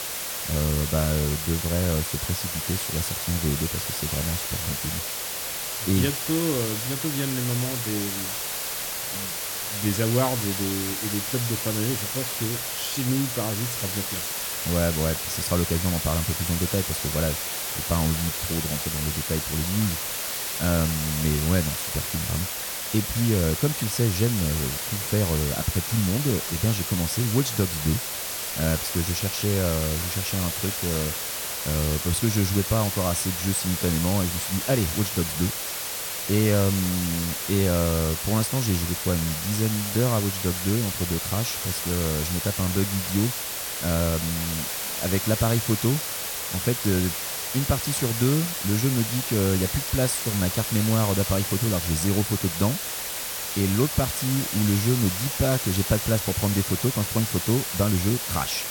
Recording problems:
hiss; loud; throughout; 1 dB below the speech

